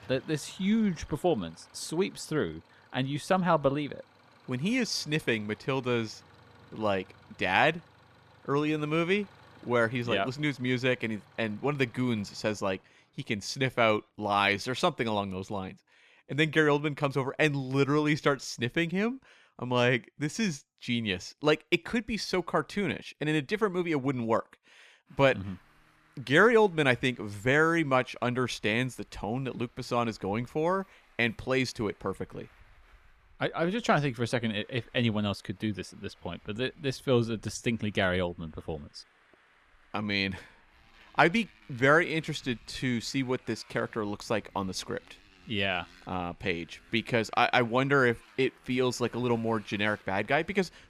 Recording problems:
traffic noise; faint; throughout; 30 dB below the speech

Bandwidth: 14.5 kHz